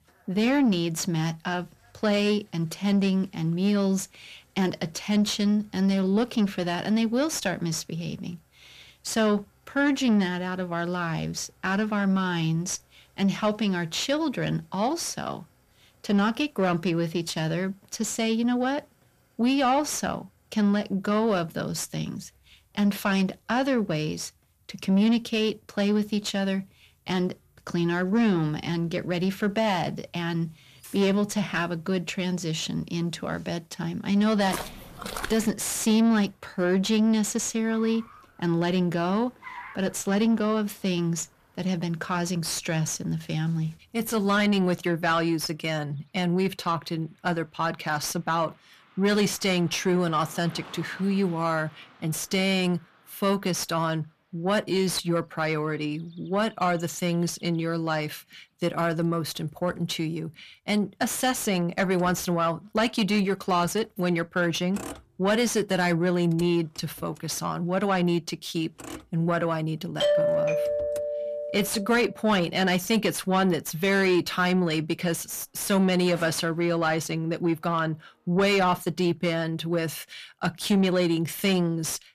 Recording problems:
distortion; slight; 10 dB below the speech
traffic noise; faint; throughout; 25 dB below the speech
footsteps; noticeable; from 34 to 35 s; peak 7 dB below the speech
doorbell; loud; from 1:10 to 1:12; peak 4 dB above the speech

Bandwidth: 14.5 kHz